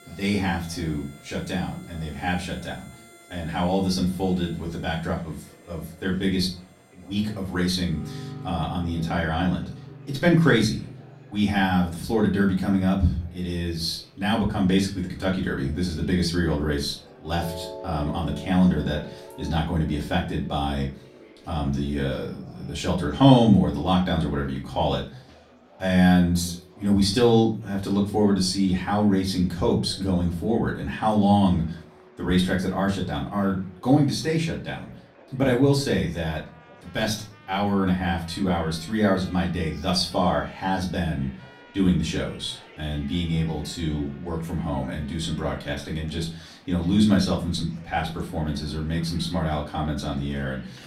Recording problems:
off-mic speech; far
room echo; slight; dies away in 0.3 s
background music; faint; throughout; 20 dB below the speech
murmuring crowd; faint; throughout; 25 dB below the speech

